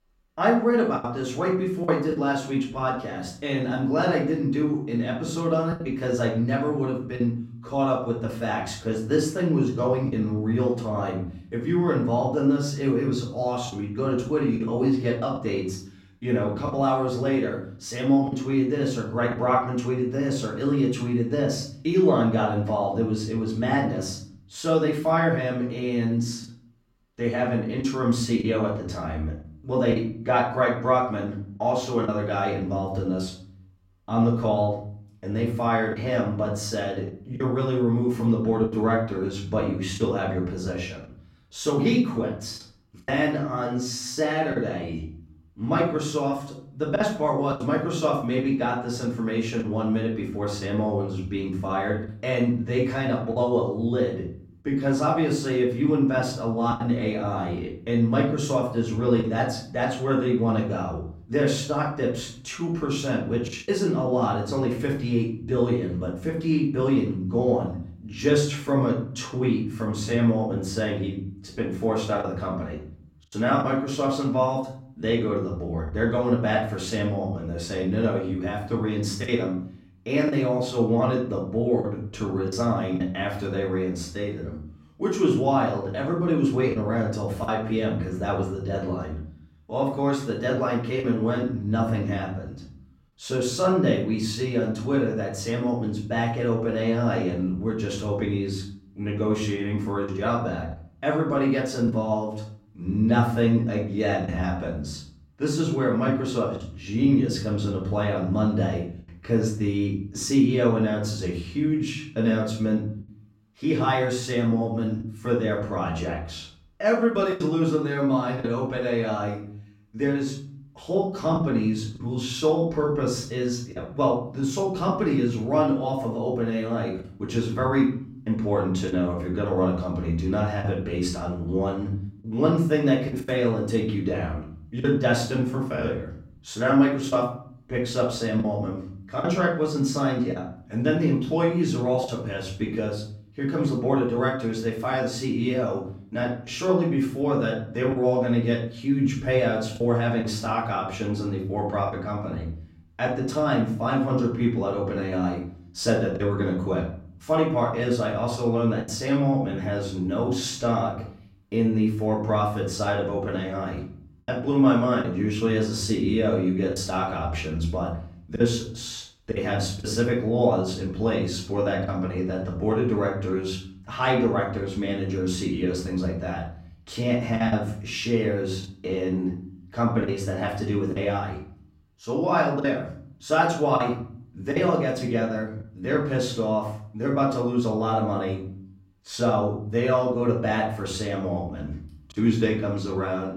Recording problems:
off-mic speech; far
room echo; noticeable; dies away in 0.5 s
choppy; occasionally; 2% of the speech affected

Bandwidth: 16 kHz